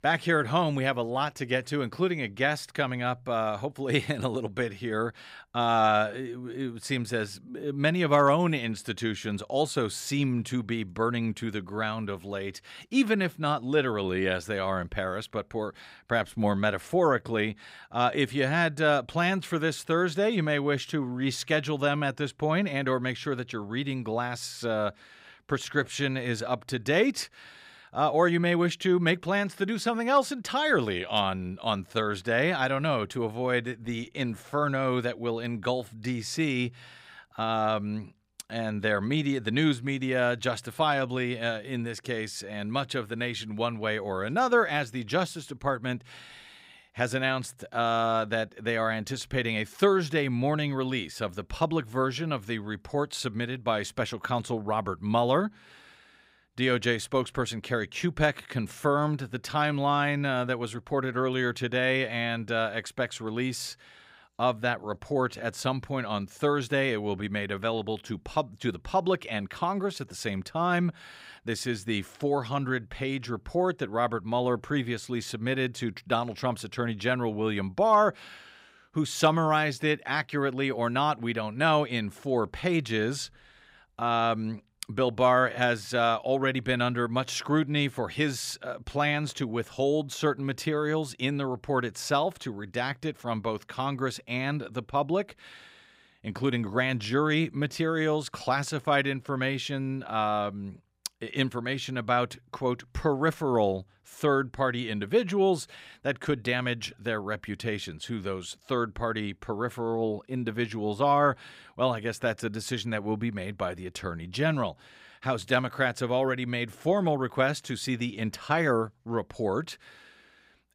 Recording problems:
none

